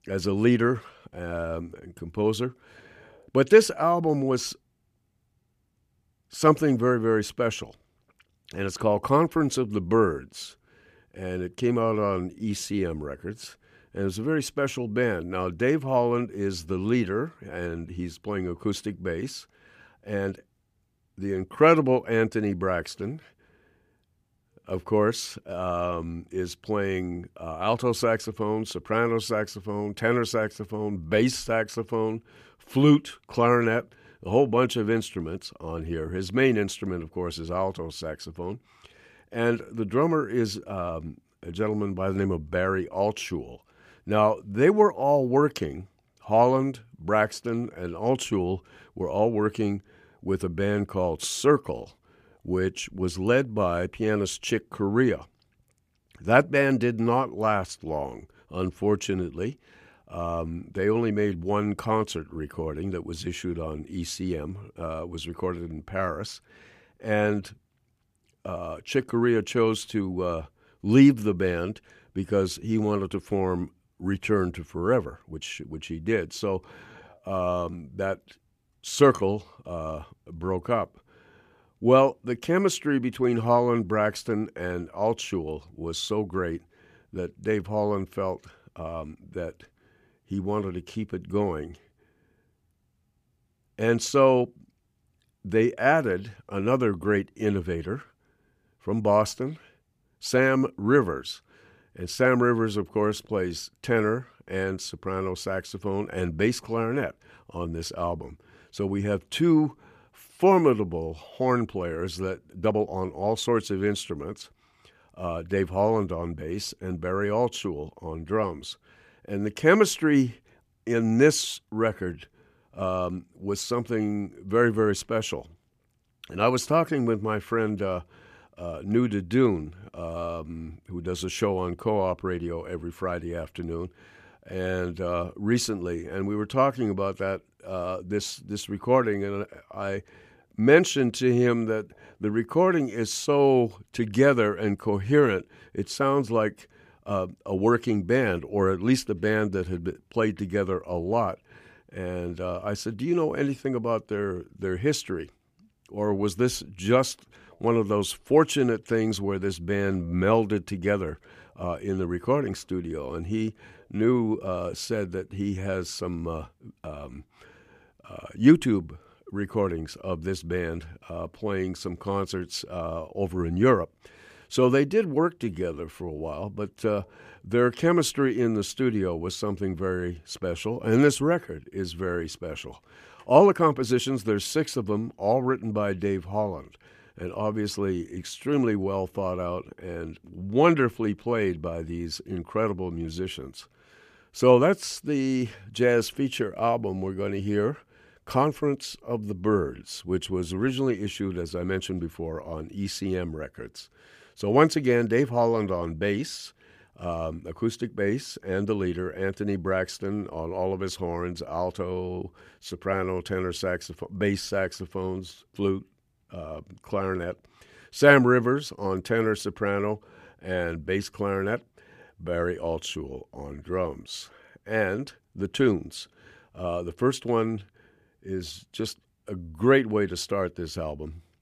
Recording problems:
uneven, jittery; strongly; from 12 s to 3:04

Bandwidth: 15 kHz